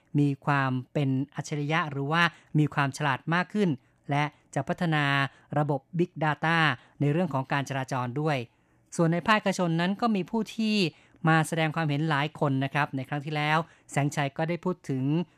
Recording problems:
none

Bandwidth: 14.5 kHz